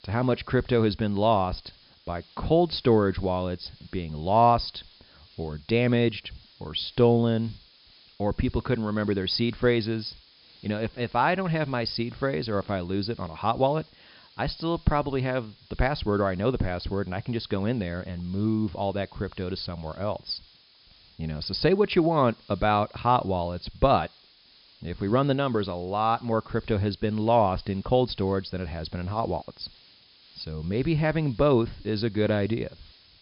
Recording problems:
high frequencies cut off; noticeable; nothing above 5.5 kHz
hiss; faint; throughout; 25 dB below the speech

